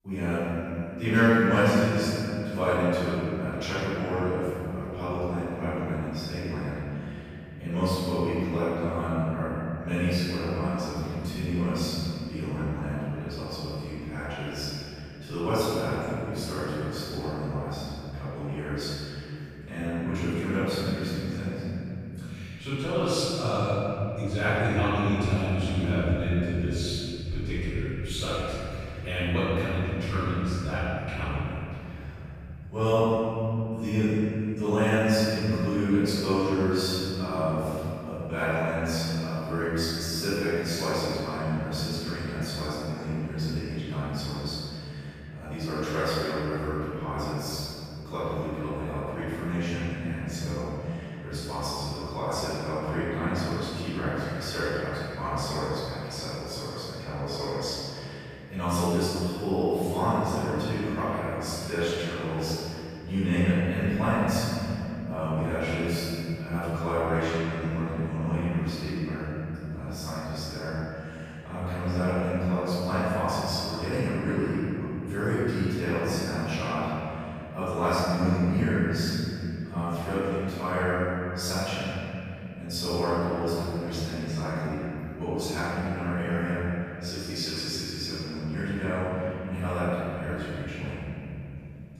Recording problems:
room echo; strong; dies away in 3 s
off-mic speech; far

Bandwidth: 14.5 kHz